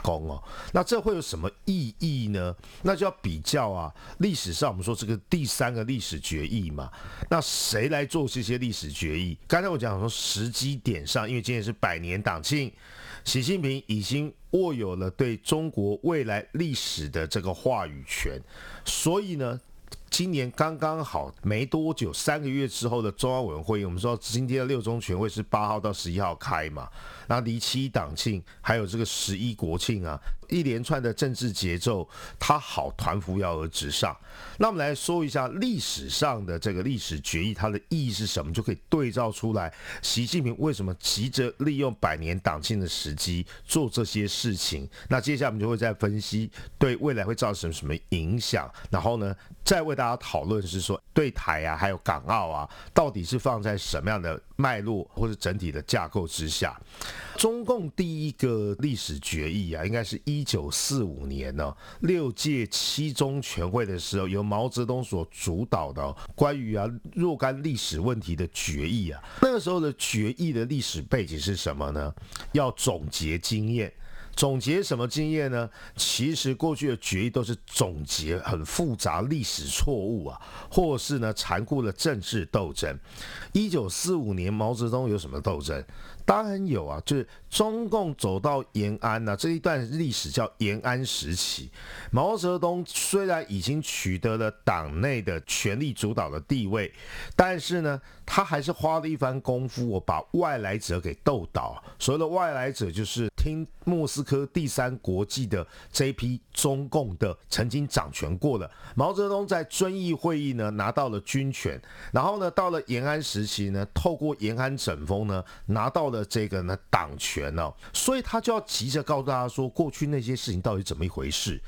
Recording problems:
squashed, flat; somewhat

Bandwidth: 18.5 kHz